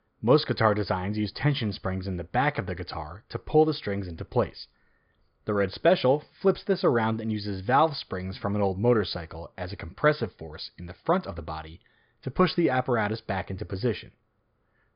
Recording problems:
high frequencies cut off; noticeable; nothing above 5 kHz

